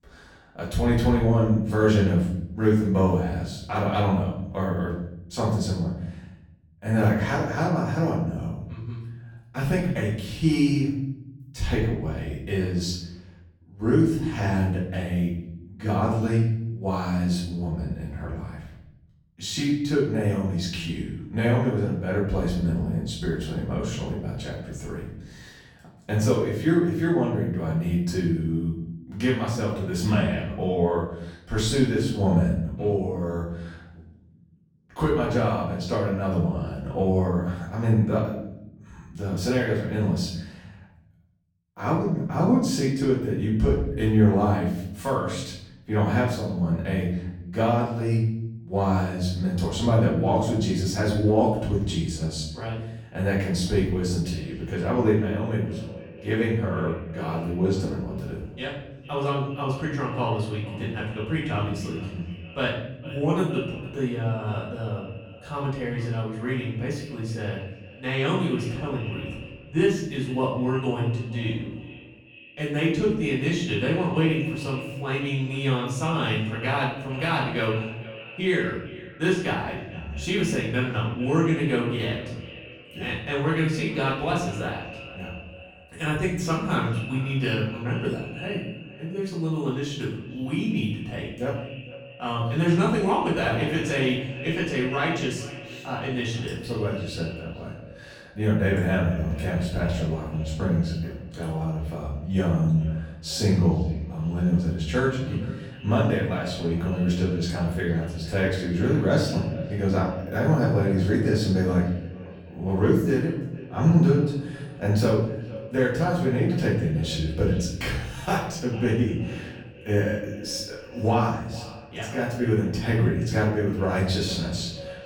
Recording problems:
off-mic speech; far
echo of what is said; noticeable; from 54 s on; 460 ms later, 15 dB below the speech
room echo; noticeable; dies away in 0.9 s

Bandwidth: 18 kHz